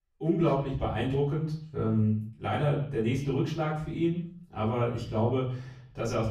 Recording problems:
off-mic speech; far
echo of what is said; faint; throughout; 130 ms later, 20 dB below the speech
room echo; slight; dies away in 0.5 s

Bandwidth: 15.5 kHz